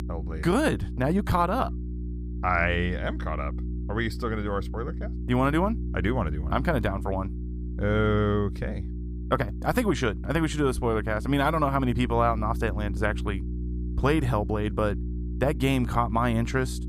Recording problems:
electrical hum; noticeable; throughout; 60 Hz, 20 dB below the speech

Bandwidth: 15 kHz